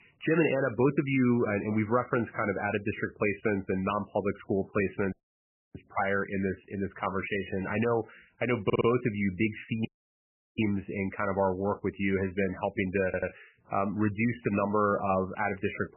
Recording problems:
garbled, watery; badly; nothing above 3 kHz
audio cutting out; at 5 s for 0.5 s and at 10 s for 0.5 s
audio stuttering; at 8.5 s and at 13 s

